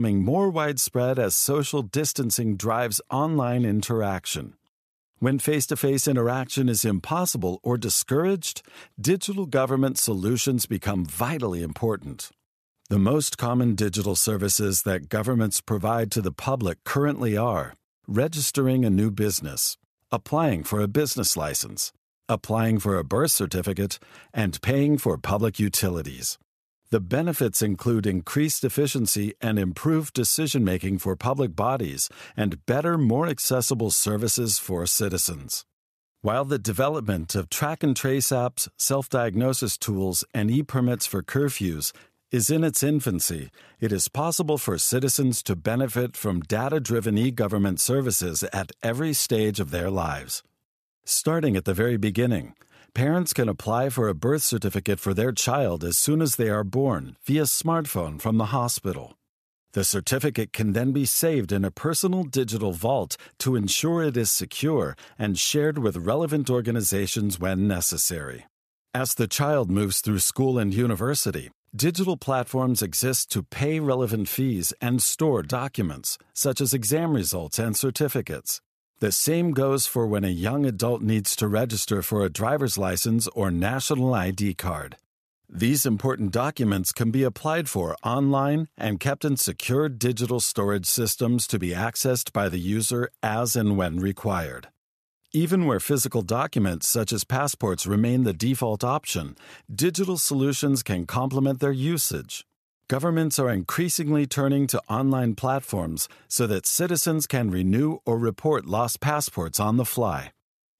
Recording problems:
abrupt cut into speech; at the start

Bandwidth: 14.5 kHz